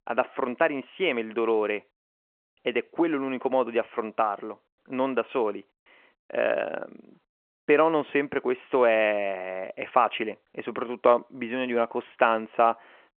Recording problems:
phone-call audio

